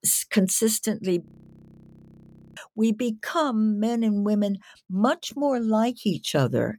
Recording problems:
audio freezing; at 1.5 s for 1.5 s

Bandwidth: 18 kHz